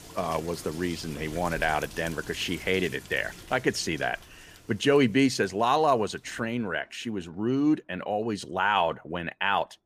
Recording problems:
rain or running water; noticeable; throughout; 15 dB below the speech

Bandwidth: 15 kHz